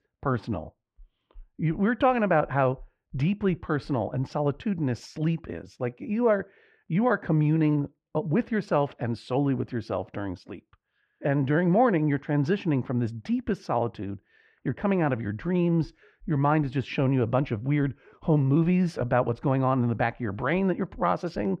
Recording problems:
muffled; very; fading above 2 kHz

